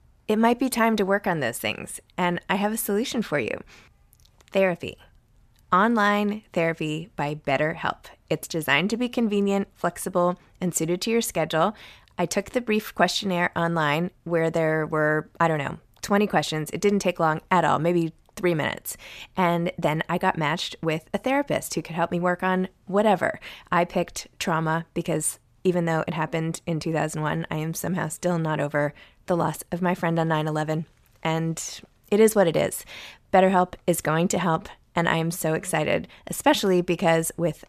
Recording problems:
none

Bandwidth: 14.5 kHz